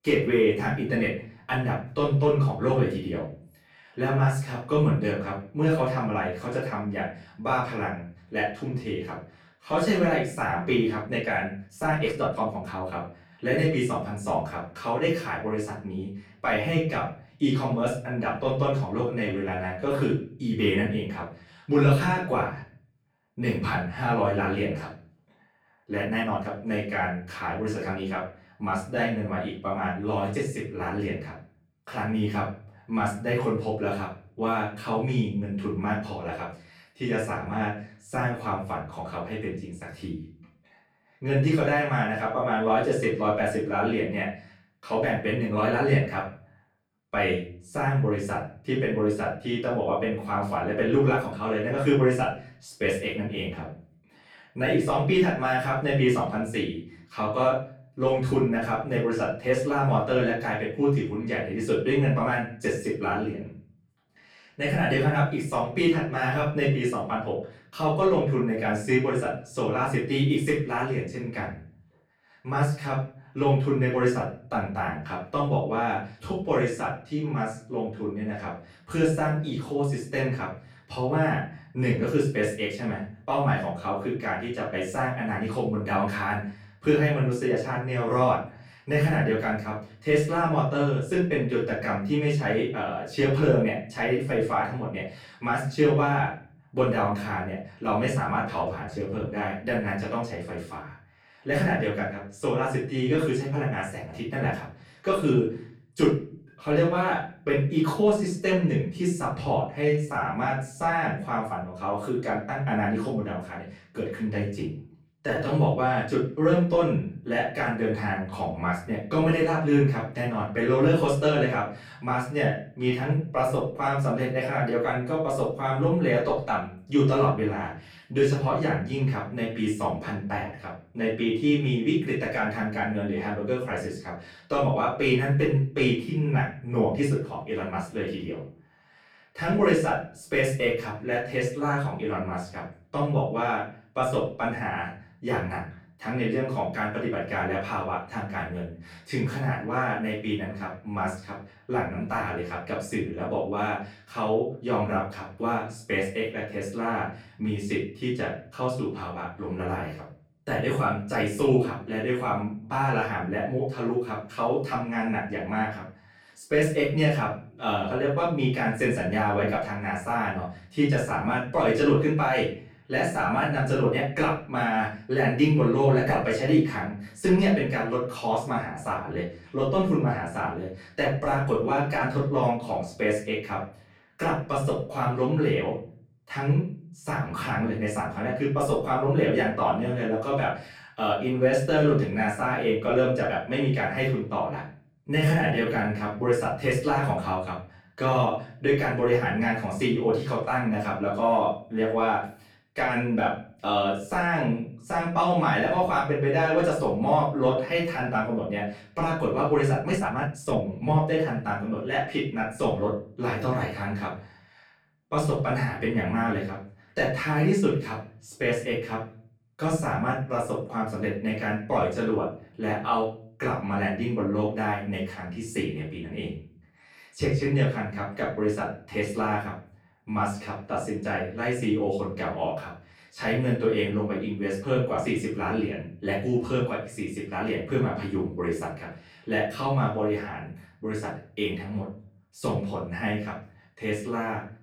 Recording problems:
off-mic speech; far
room echo; noticeable; dies away in 0.4 s
uneven, jittery; strongly; from 11 s to 3:31

